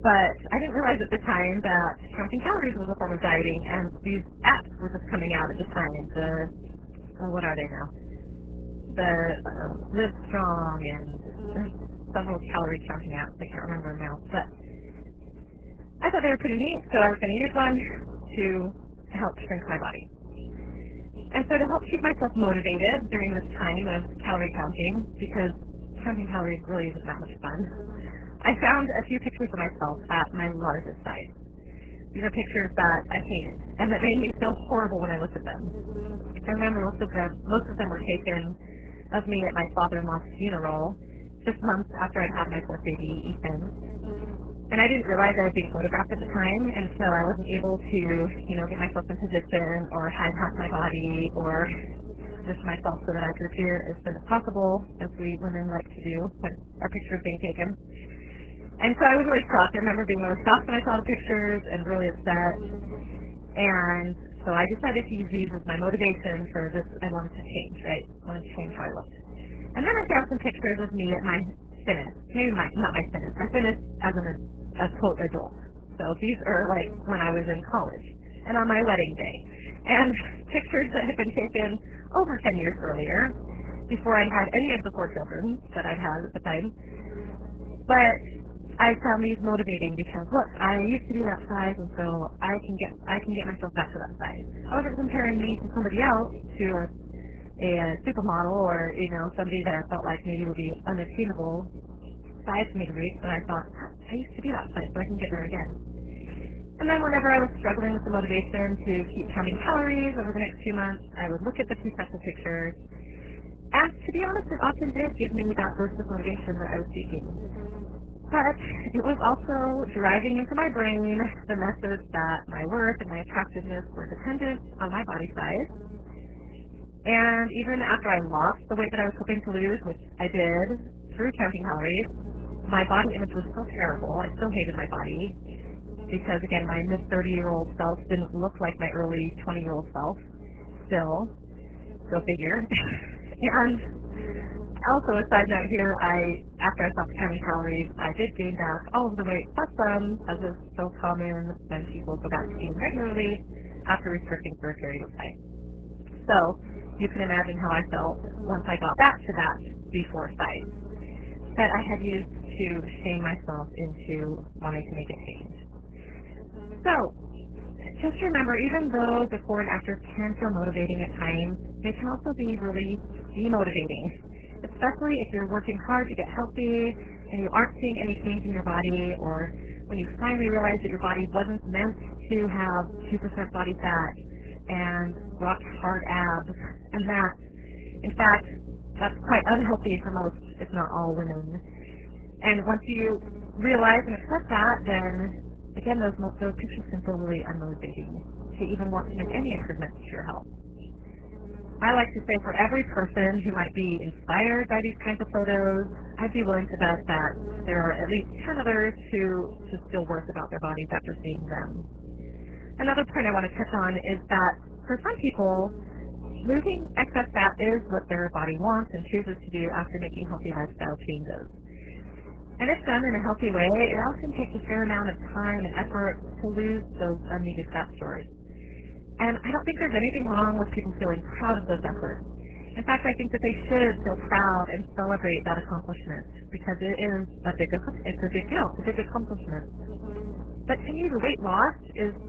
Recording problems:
garbled, watery; badly; nothing above 3 kHz
electrical hum; faint; throughout; 60 Hz, 20 dB below the speech

